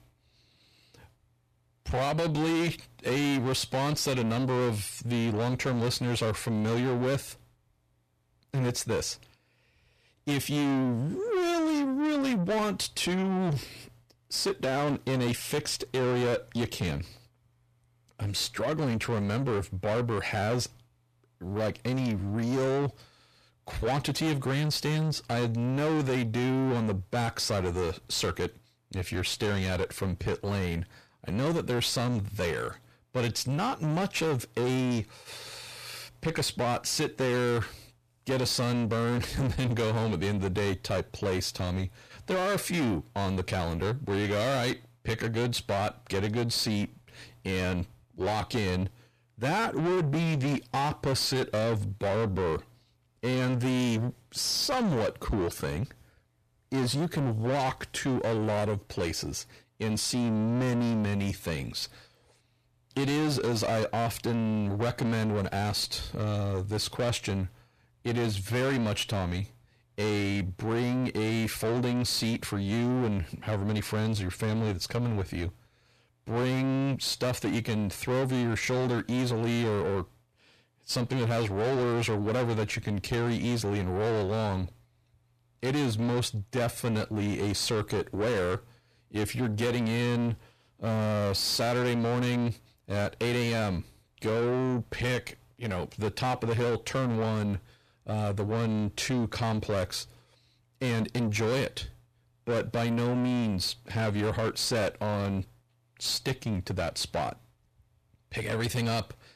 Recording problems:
distortion; heavy; 7 dB below the speech

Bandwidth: 14.5 kHz